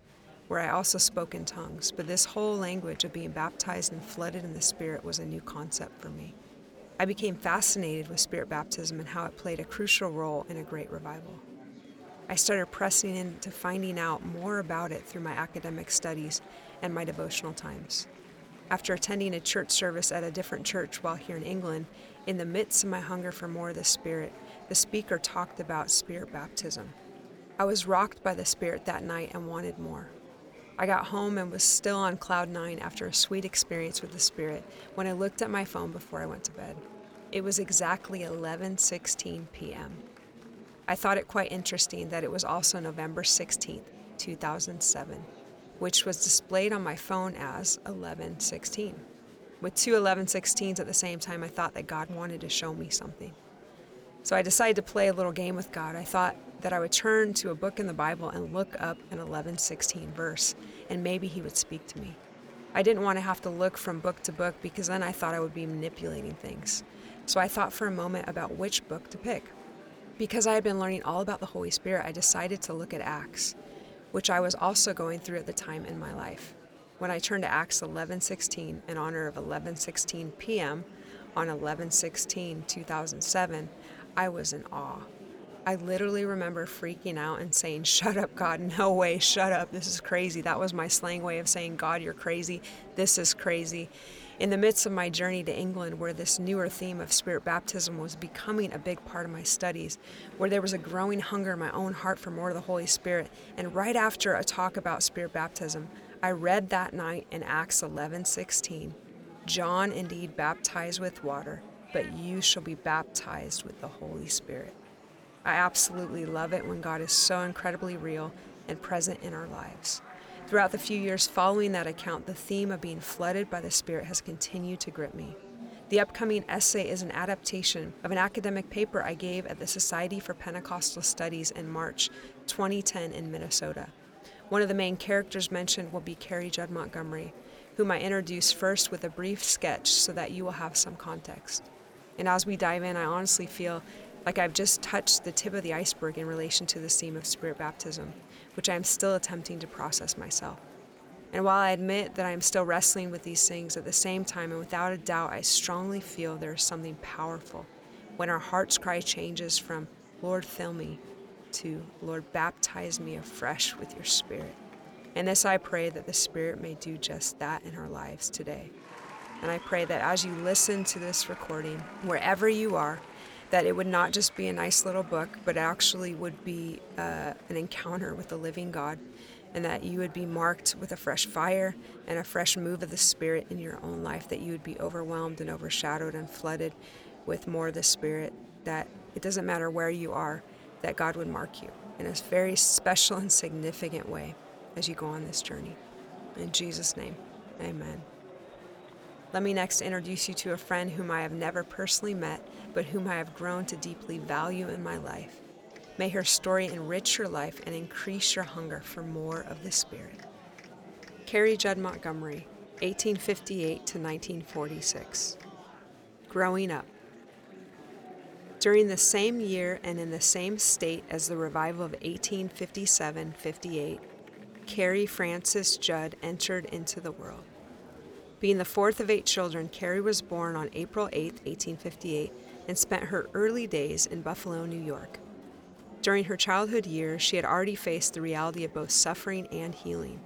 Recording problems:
murmuring crowd; faint; throughout; 20 dB below the speech

